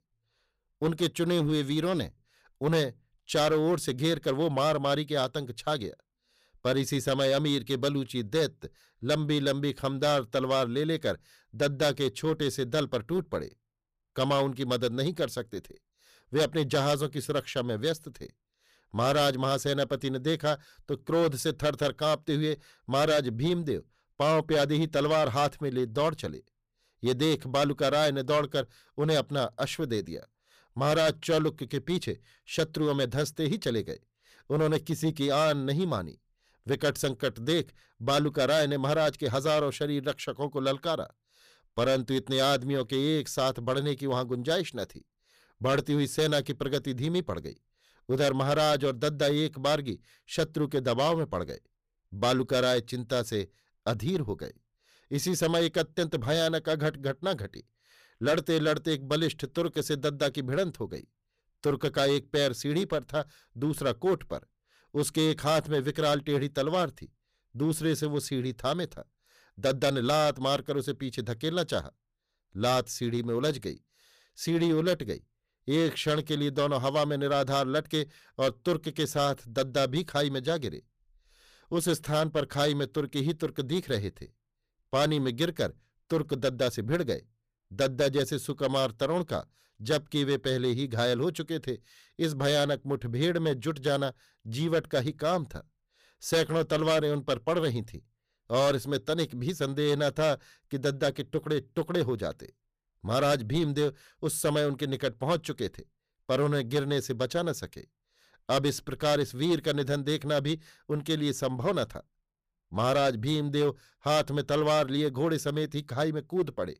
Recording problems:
distortion; slight; 6% of the sound clipped

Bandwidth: 15 kHz